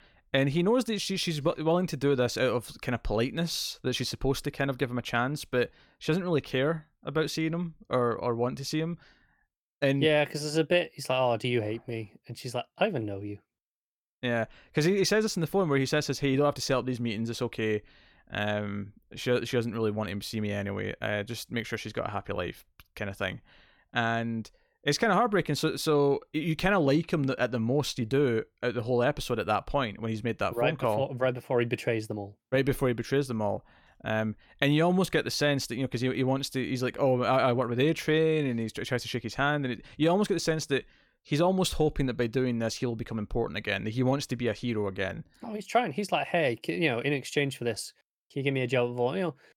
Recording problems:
none

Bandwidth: 17.5 kHz